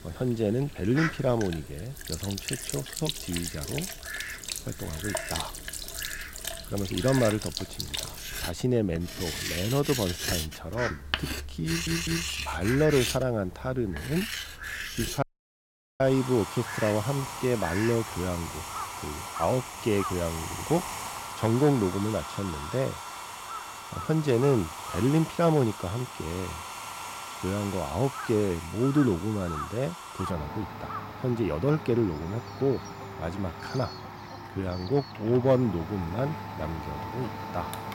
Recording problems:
household noises; loud; throughout; 7 dB below the speech
animal sounds; noticeable; throughout; 10 dB below the speech
audio stuttering; at 12 s and at 20 s
audio cutting out; at 15 s for 1 s

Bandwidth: 16 kHz